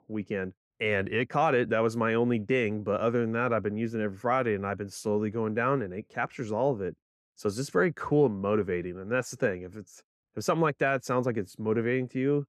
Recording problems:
muffled; slightly; fading above 3 kHz

